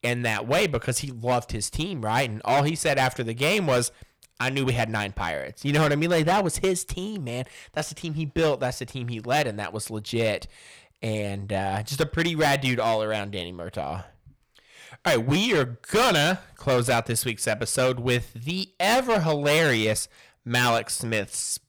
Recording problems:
distortion; heavy; 8% of the sound clipped

